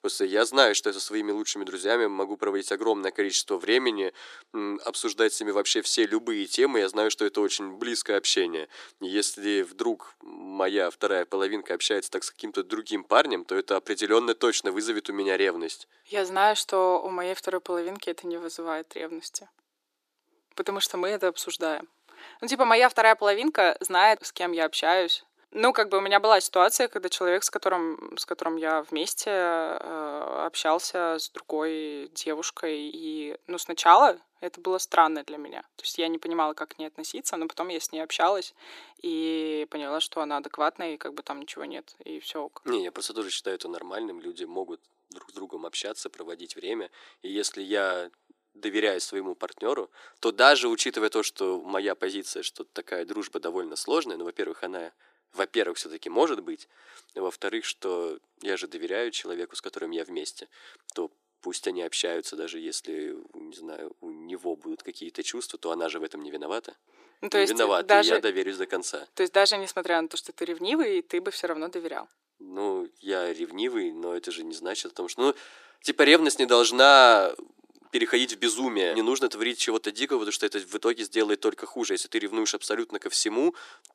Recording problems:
thin; very; fading below 300 Hz

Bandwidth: 14.5 kHz